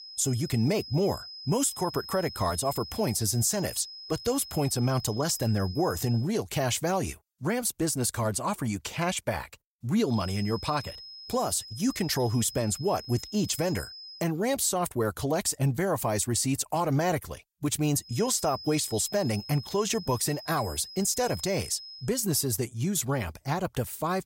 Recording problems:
high-pitched whine; noticeable; until 6 s, from 10 to 14 s and from 18 to 22 s; 5 kHz, 15 dB below the speech

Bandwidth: 16 kHz